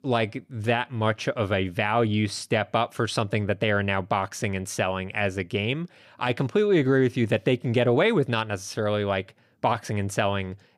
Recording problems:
none

